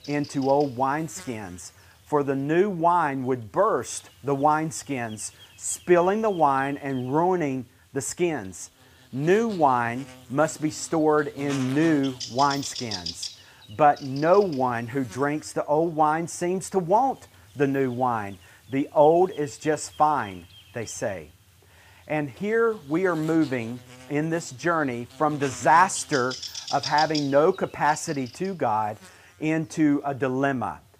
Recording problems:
electrical hum; noticeable; throughout; 50 Hz, 15 dB below the speech

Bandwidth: 15 kHz